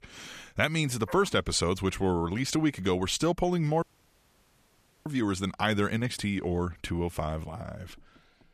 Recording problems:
audio cutting out; at 4 s for 1 s

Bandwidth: 14.5 kHz